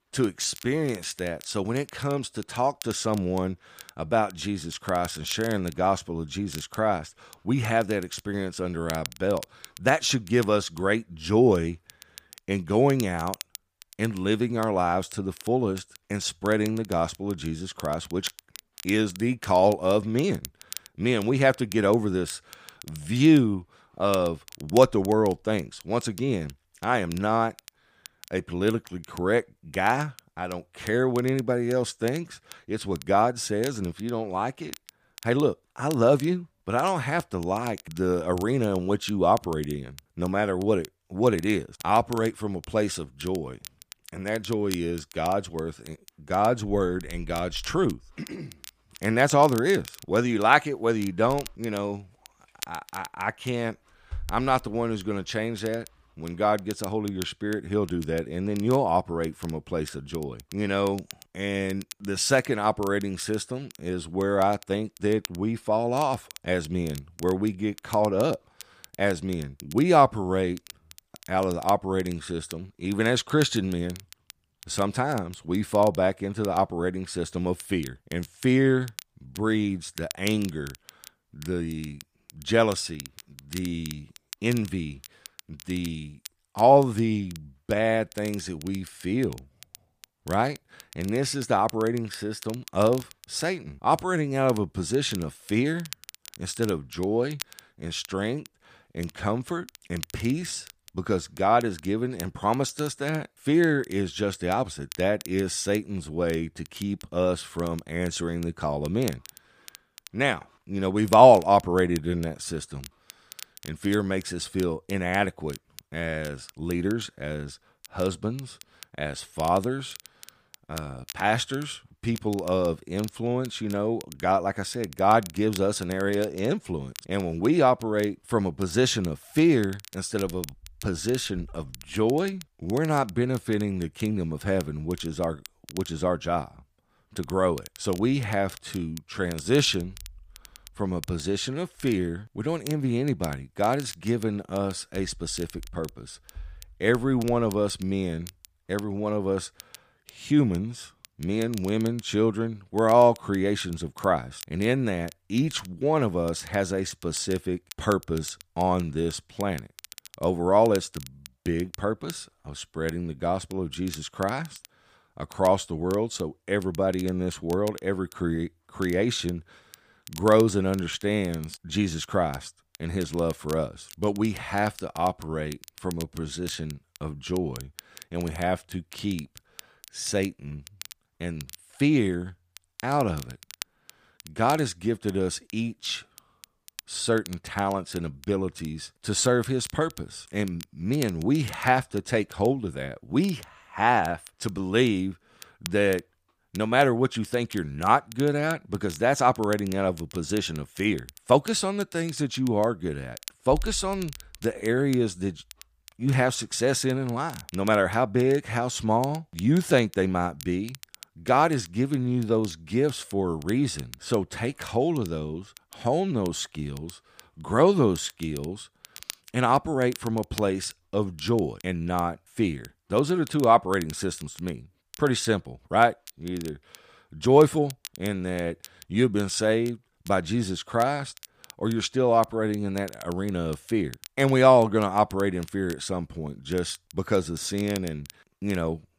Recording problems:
crackle, like an old record; noticeable; 20 dB below the speech

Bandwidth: 15 kHz